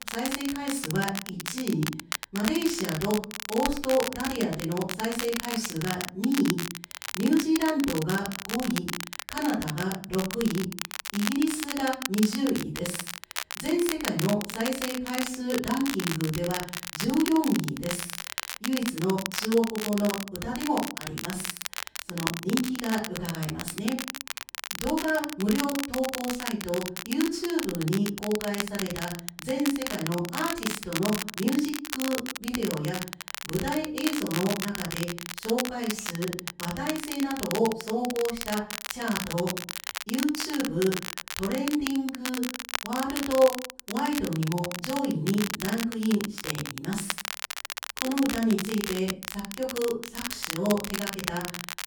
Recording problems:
off-mic speech; far
room echo; slight; dies away in 0.4 s
crackle, like an old record; loud; 5 dB below the speech

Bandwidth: 18.5 kHz